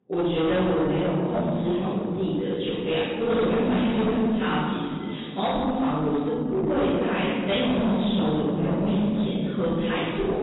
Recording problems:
room echo; strong; dies away in 1.9 s
off-mic speech; far
garbled, watery; badly; nothing above 4 kHz
distortion; slight; 20% of the sound clipped

